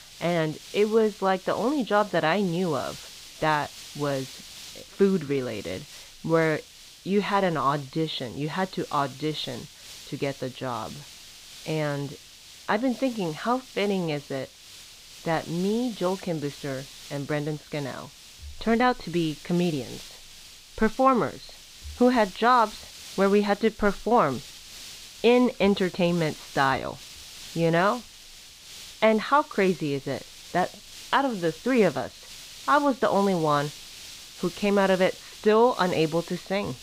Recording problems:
high frequencies cut off; severe; nothing above 4.5 kHz
hiss; noticeable; throughout; 15 dB below the speech

